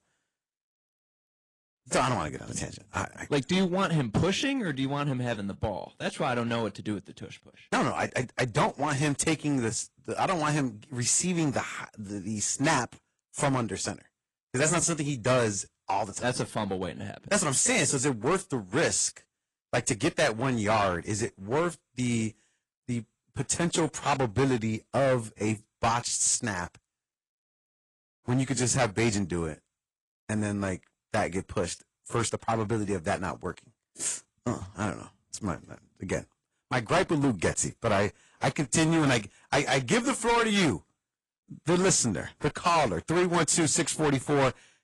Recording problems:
distortion; heavy; 7% of the sound clipped
garbled, watery; slightly

